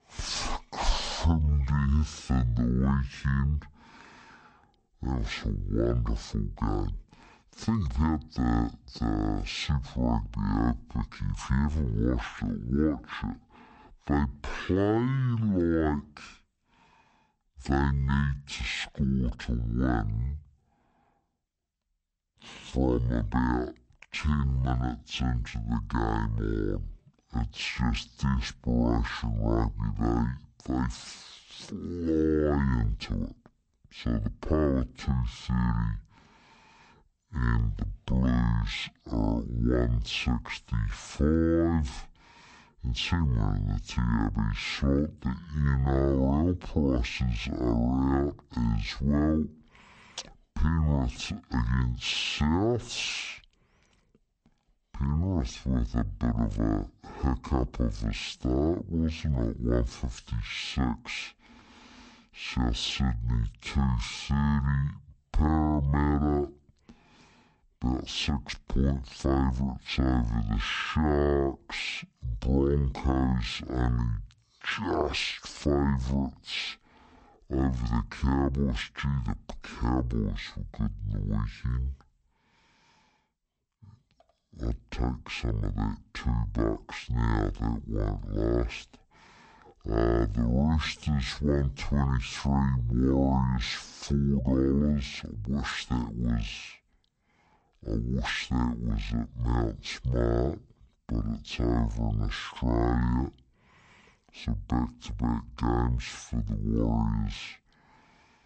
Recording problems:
wrong speed and pitch; too slow and too low; 0.5 times normal speed

